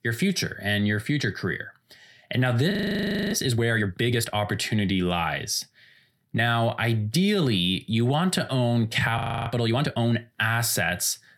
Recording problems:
audio freezing; at 2.5 s for 0.5 s and at 9 s

